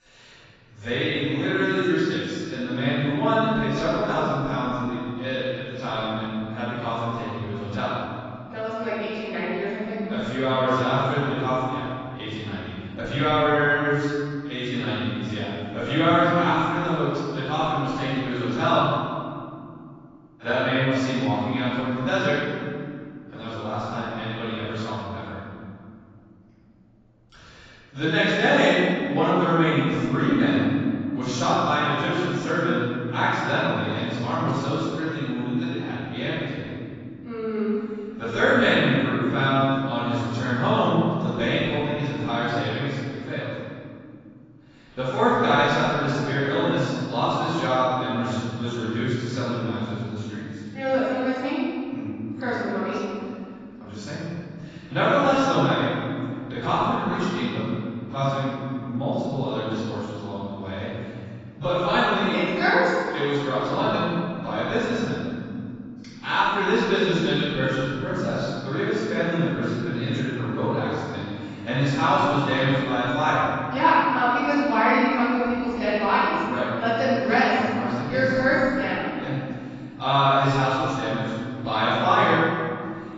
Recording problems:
room echo; strong; dies away in 2.6 s
off-mic speech; far
garbled, watery; badly; nothing above 7.5 kHz

